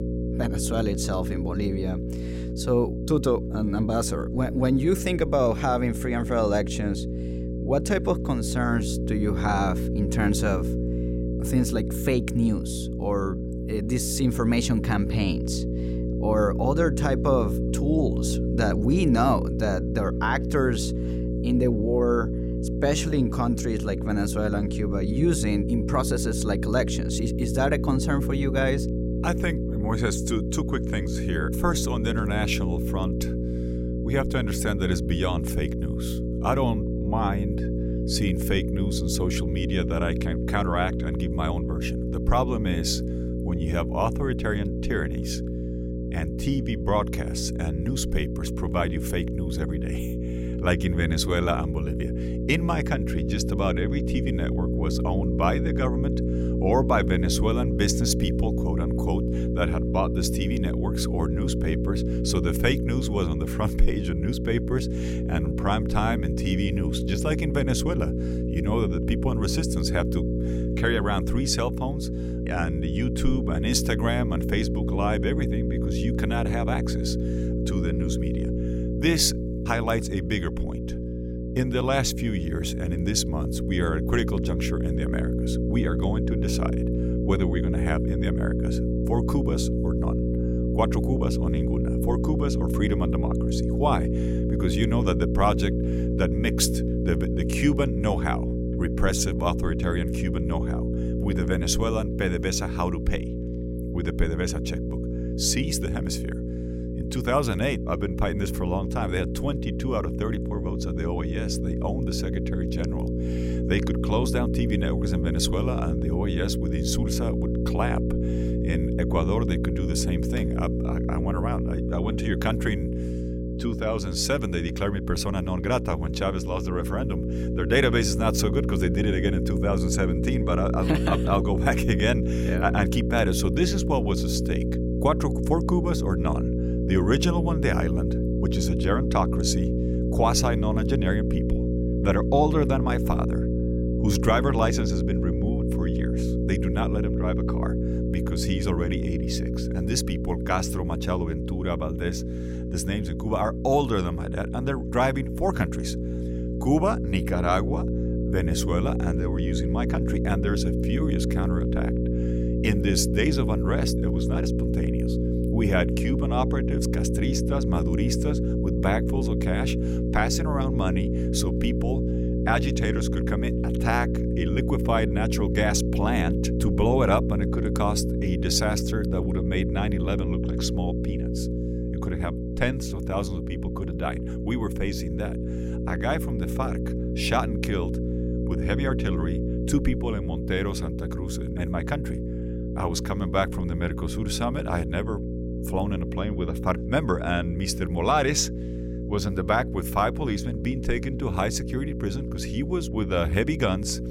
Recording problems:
electrical hum; loud; throughout; 60 Hz, 5 dB below the speech

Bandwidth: 16 kHz